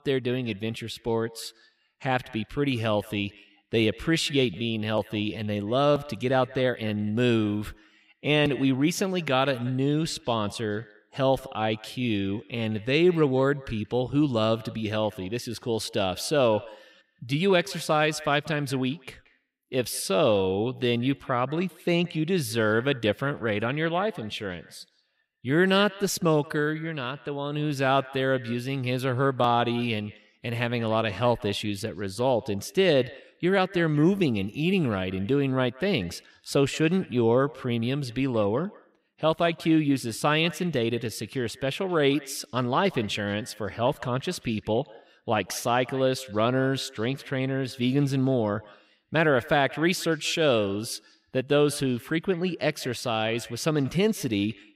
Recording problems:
echo of what is said; faint; throughout; 180 ms later, 20 dB below the speech

